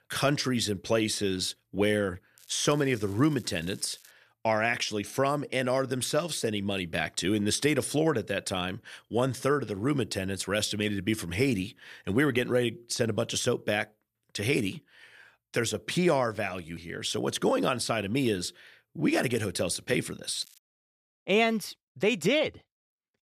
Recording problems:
crackling; faint; from 2.5 to 4 s and at 20 s; 25 dB below the speech

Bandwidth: 14.5 kHz